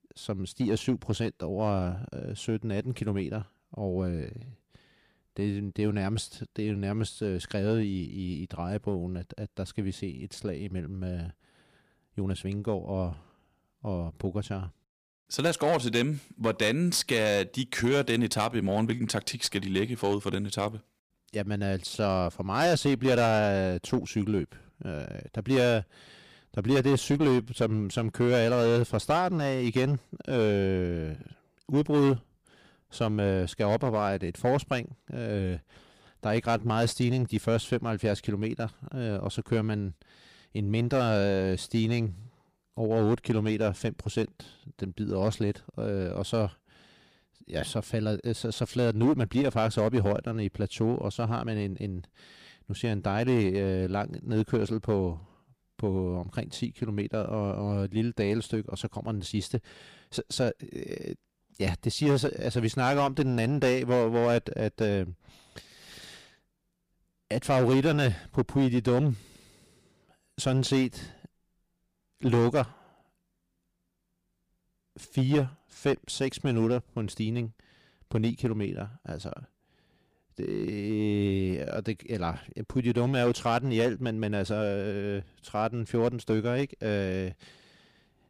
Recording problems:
distortion; slight; 5% of the sound clipped

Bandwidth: 15 kHz